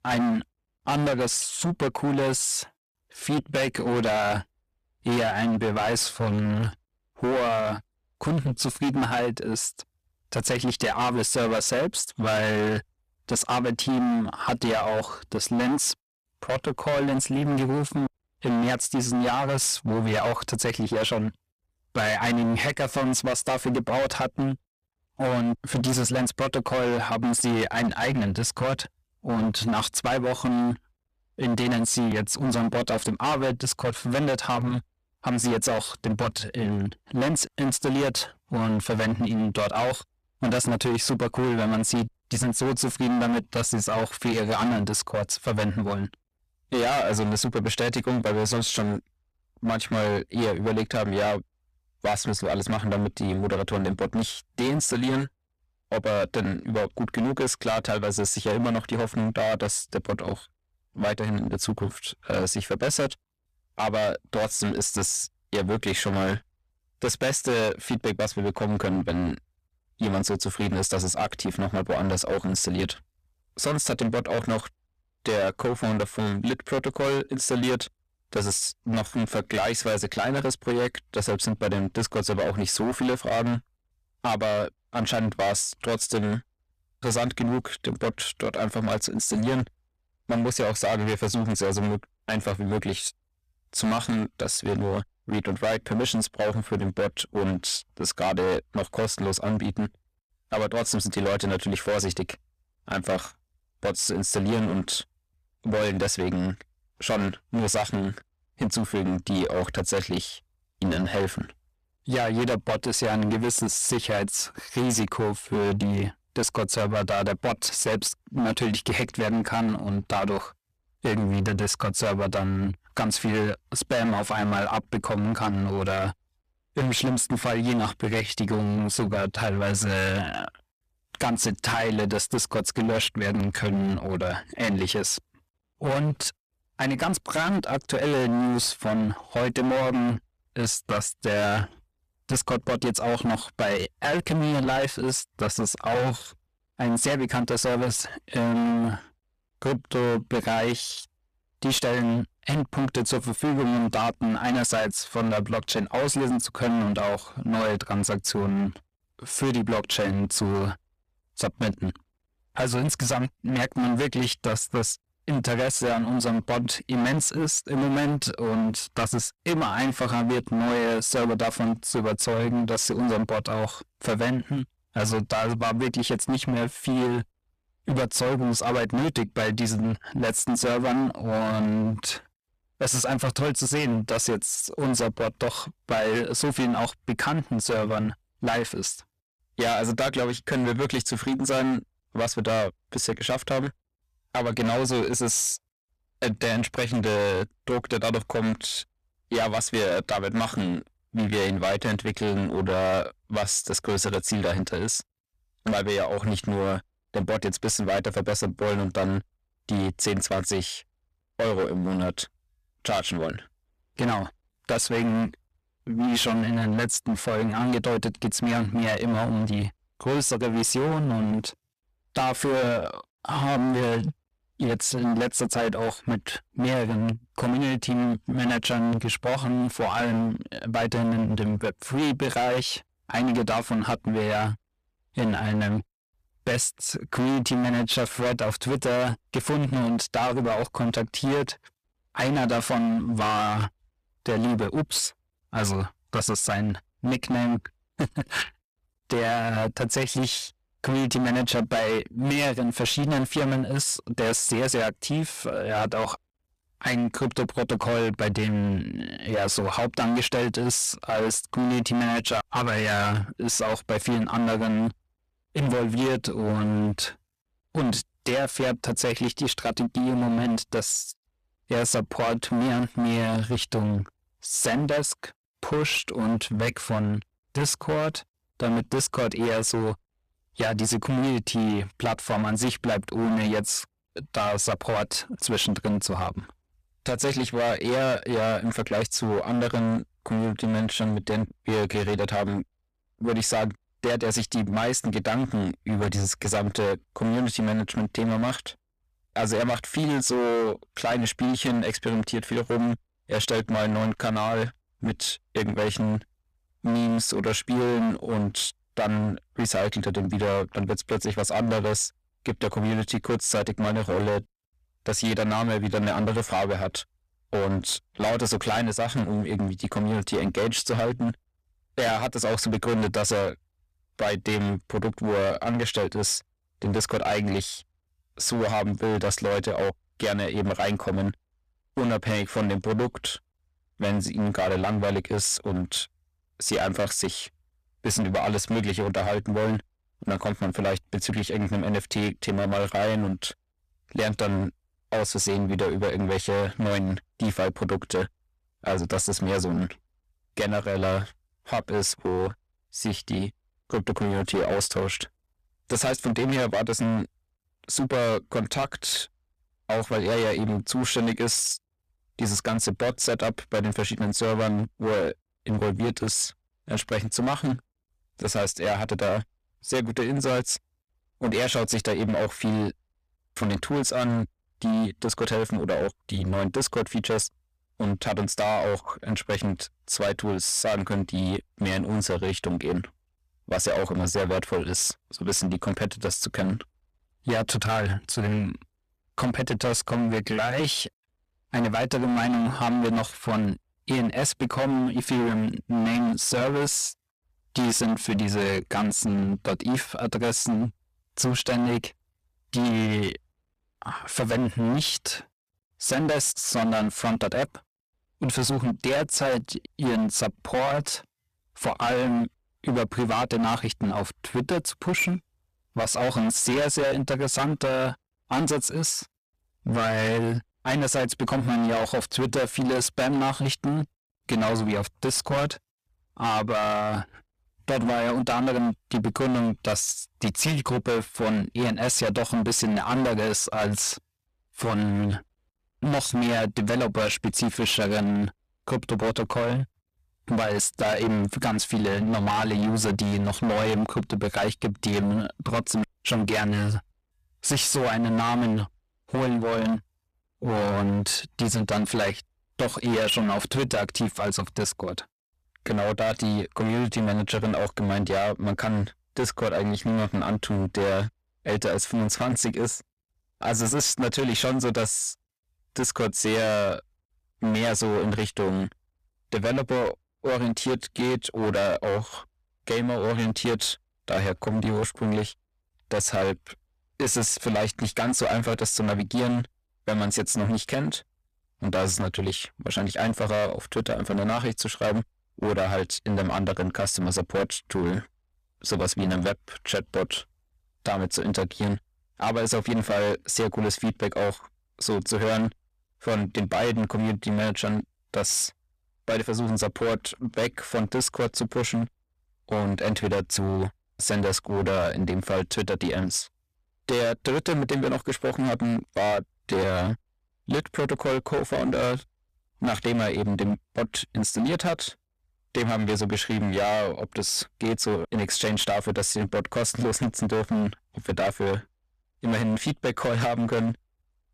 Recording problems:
distortion; heavy; 22% of the sound clipped

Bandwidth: 14.5 kHz